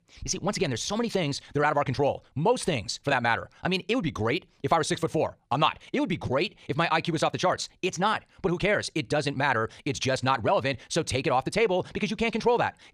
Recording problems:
wrong speed, natural pitch; too fast; 1.6 times normal speed

